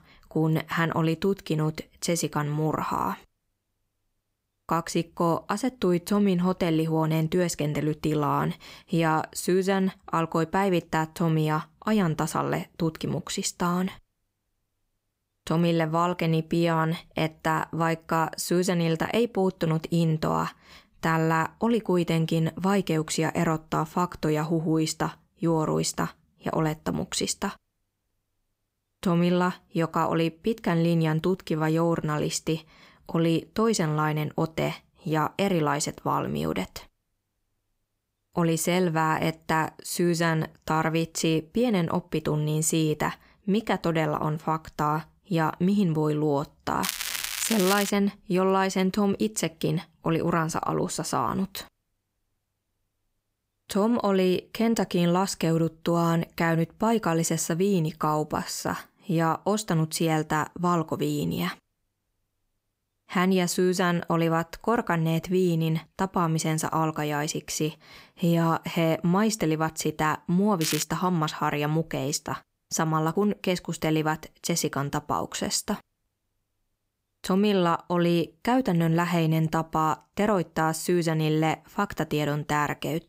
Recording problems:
crackling; loud; from 47 to 48 s and at 1:11; 4 dB below the speech

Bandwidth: 15.5 kHz